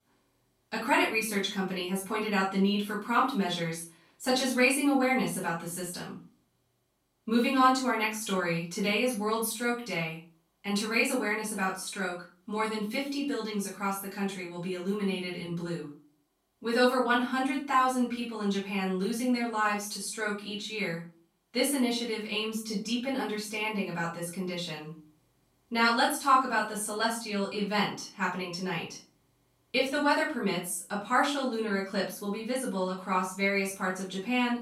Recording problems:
off-mic speech; far
room echo; noticeable; dies away in 0.3 s

